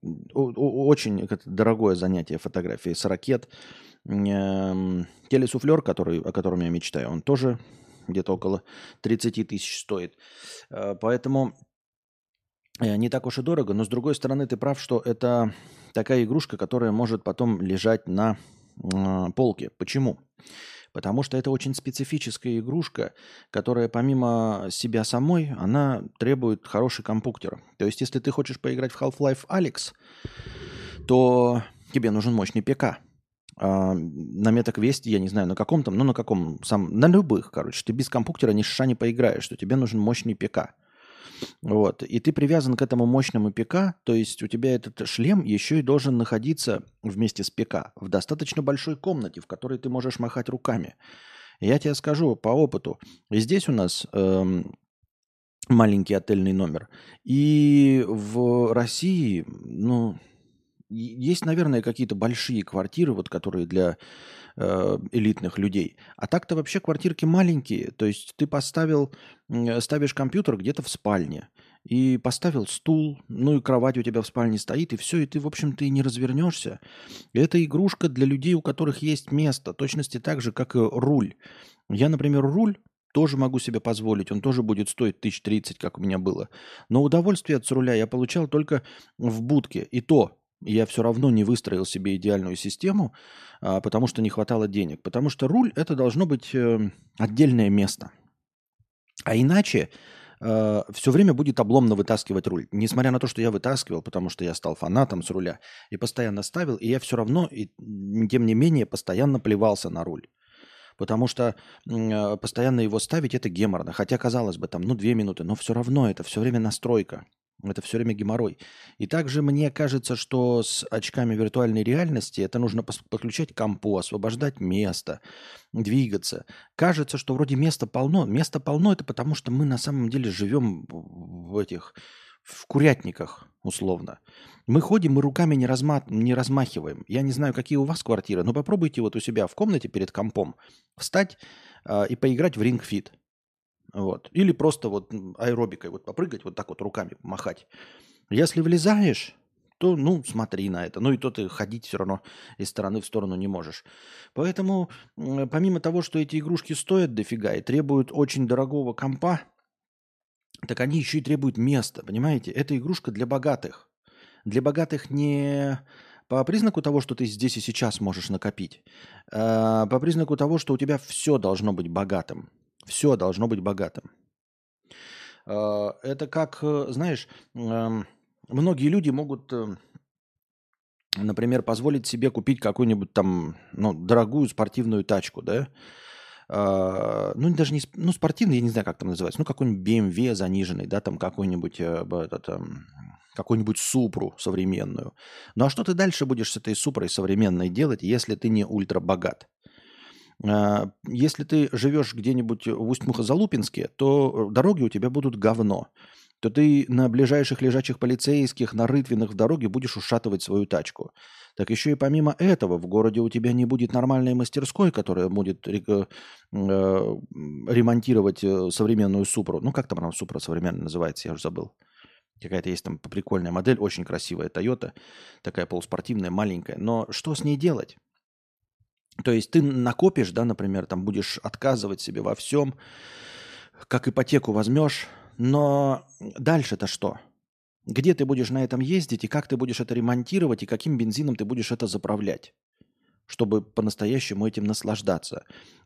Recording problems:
none

